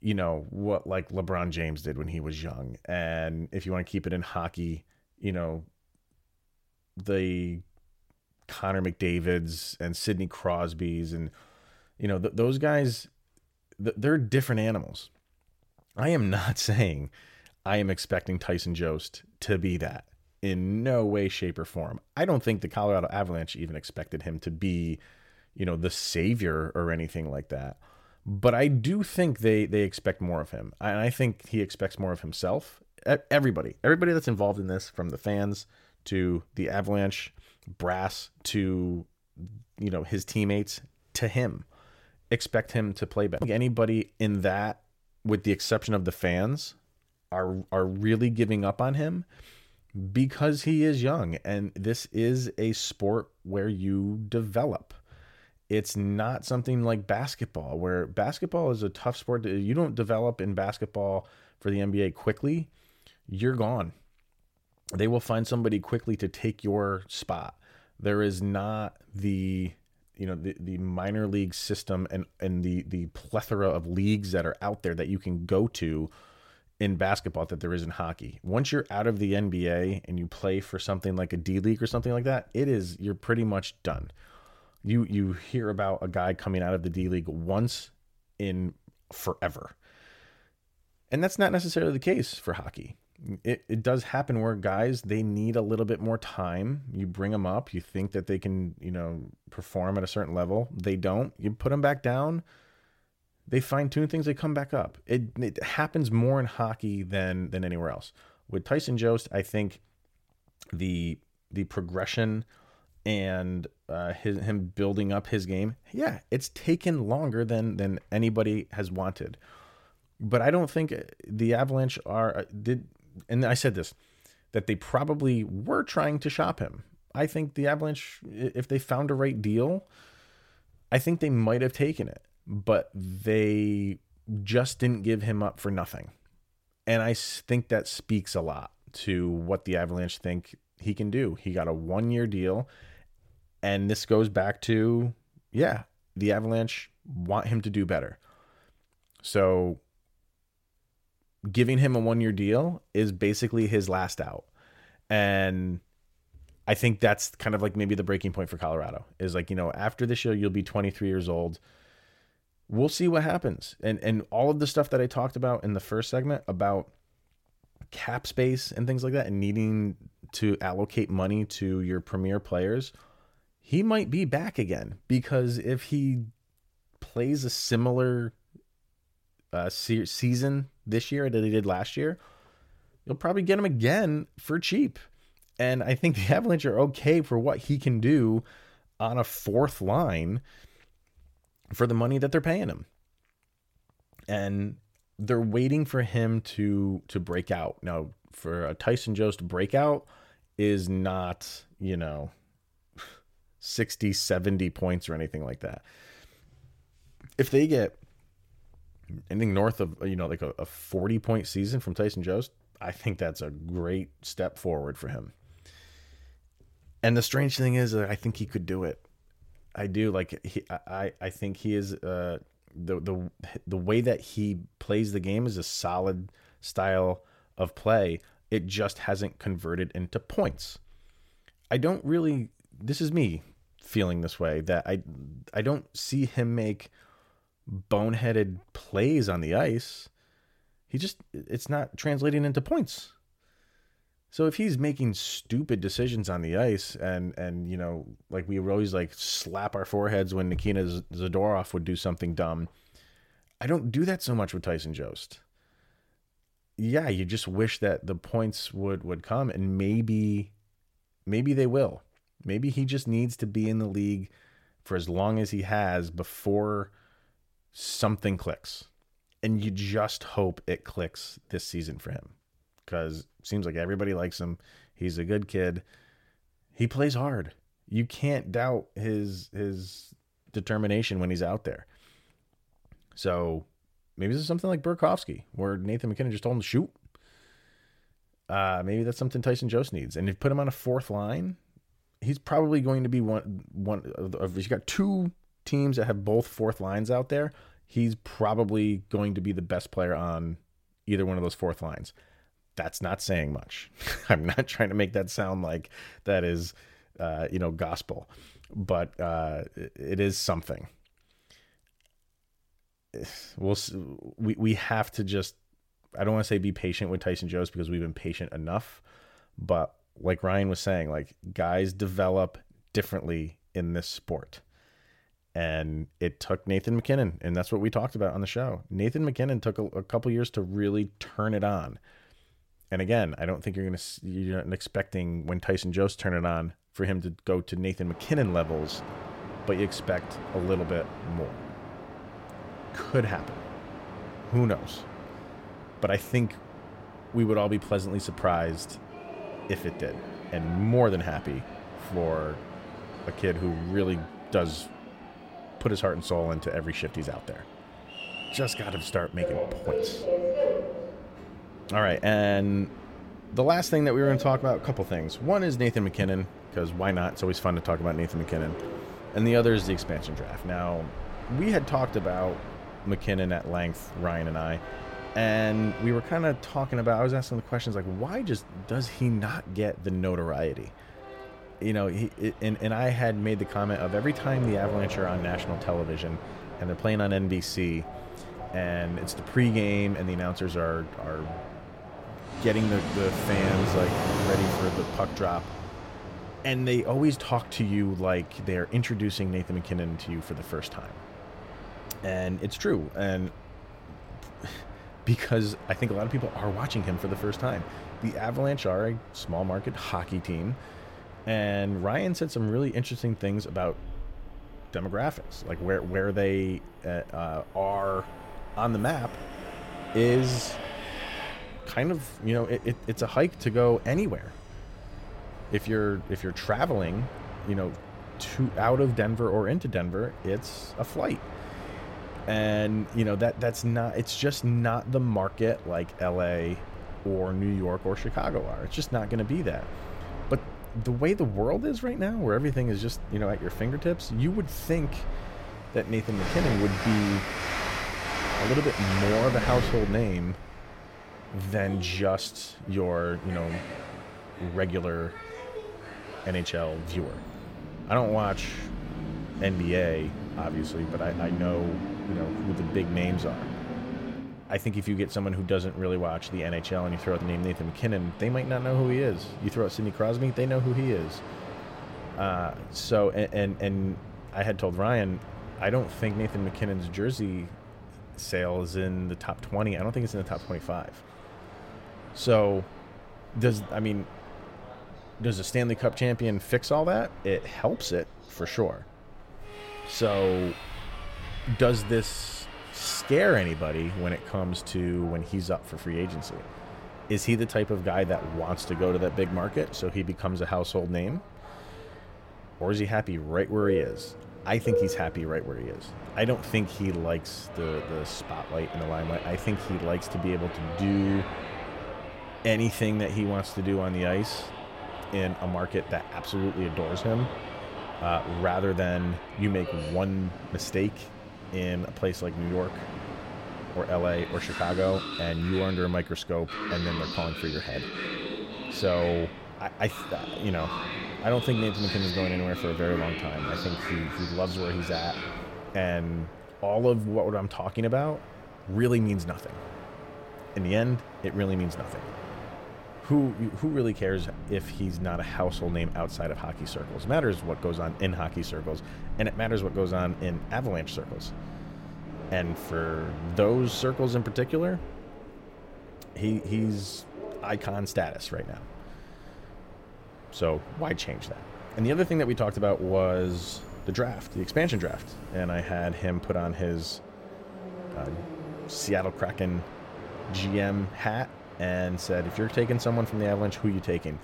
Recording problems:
train or aircraft noise; loud; from 5:38 on; 10 dB below the speech

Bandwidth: 16.5 kHz